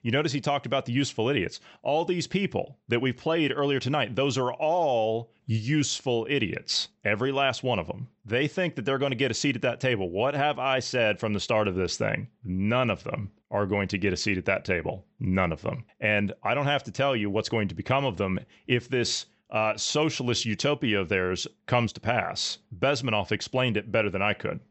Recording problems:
high frequencies cut off; noticeable; nothing above 8 kHz

